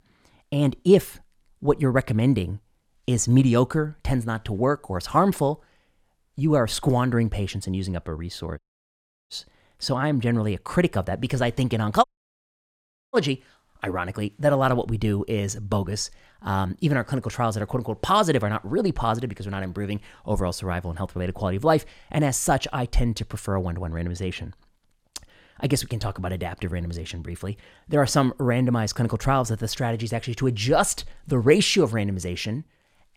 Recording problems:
audio cutting out; at 8.5 s for 0.5 s and at 12 s for 1 s

